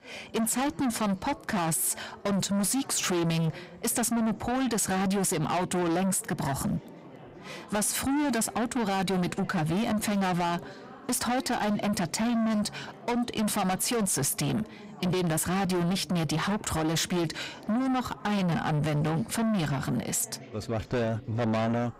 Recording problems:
distortion; heavy; 7 dB below the speech
background chatter; faint; throughout; 4 voices, 20 dB below the speech

